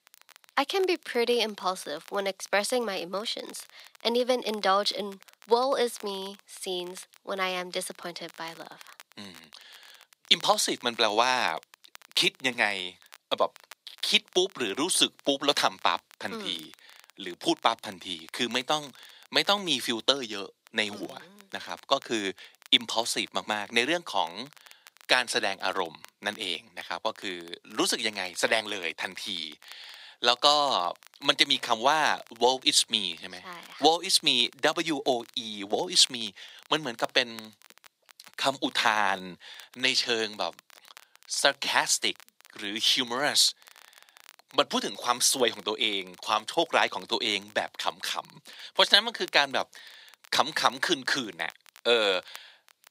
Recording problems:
thin; somewhat; fading below 500 Hz
crackle, like an old record; faint; 25 dB below the speech

